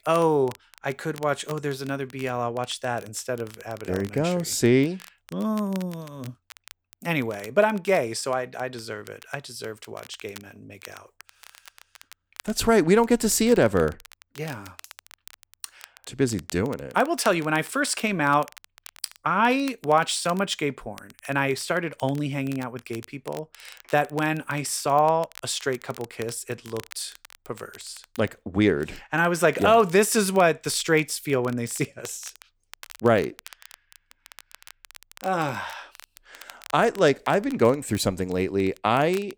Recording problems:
crackle, like an old record; faint; 25 dB below the speech

